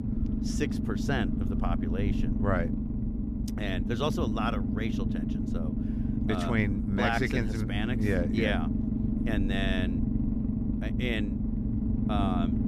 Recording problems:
low rumble; loud; throughout; 5 dB below the speech

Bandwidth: 14.5 kHz